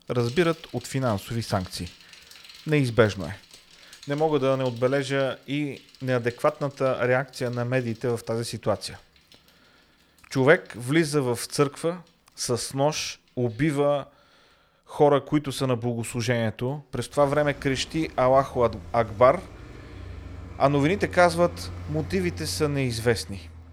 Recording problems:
traffic noise; noticeable; throughout; 20 dB below the speech

